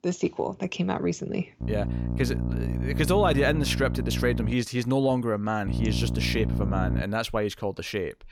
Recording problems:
electrical hum; loud; from 1.5 to 4.5 s and from 5.5 to 7 s; 60 Hz, 10 dB below the speech

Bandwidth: 17 kHz